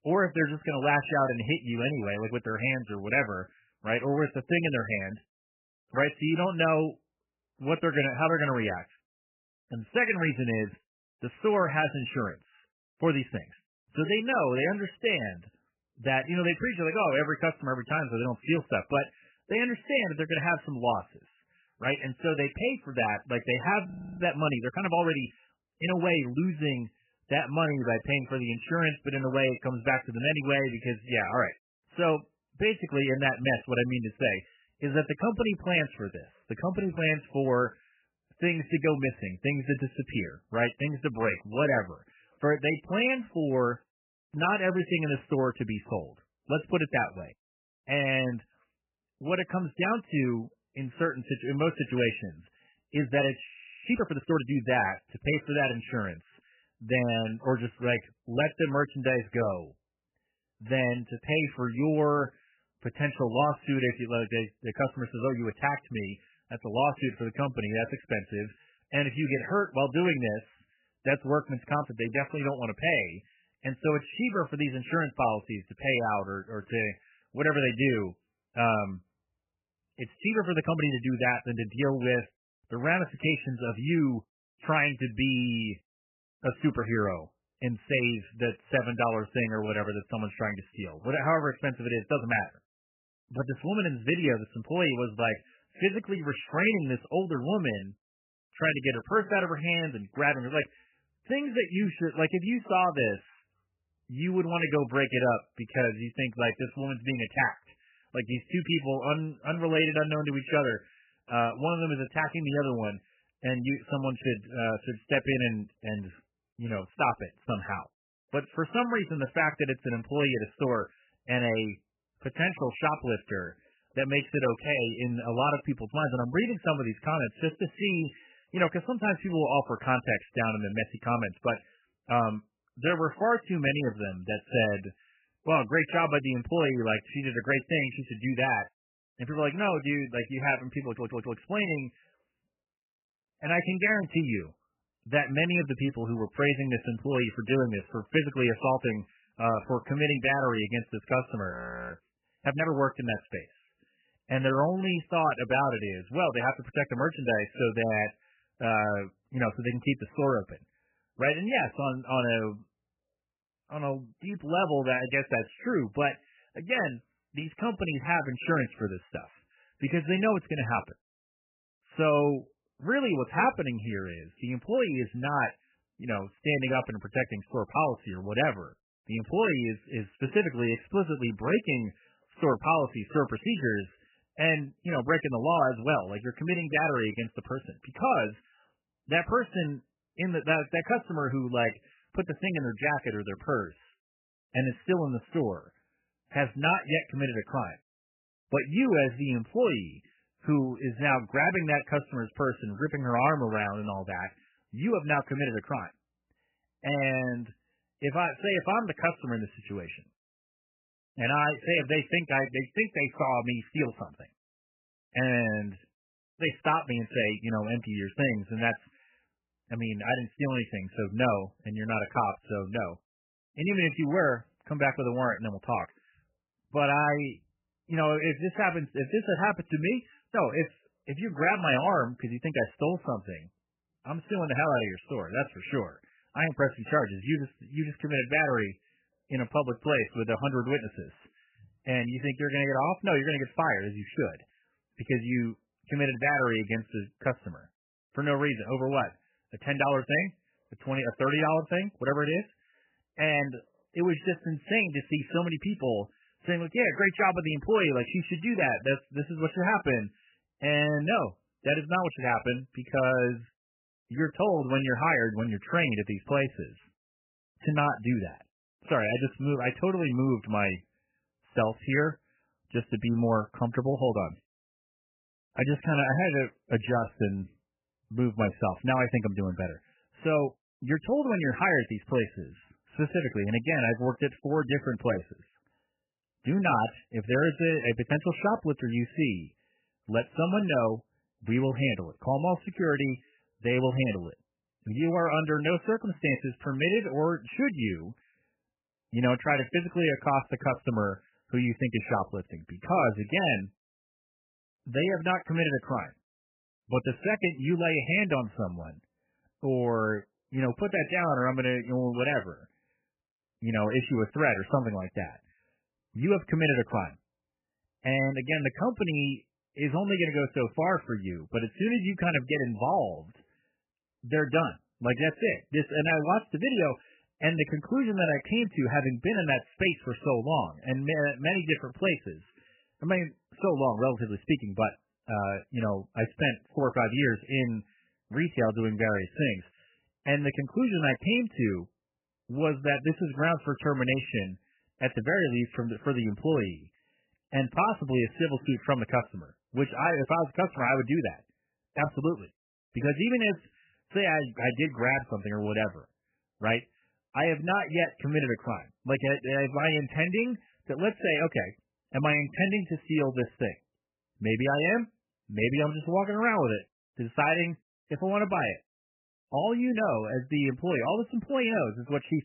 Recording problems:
garbled, watery; badly; nothing above 3 kHz
audio freezing; at 24 s, at 53 s and at 2:32
audio stuttering; at 2:21

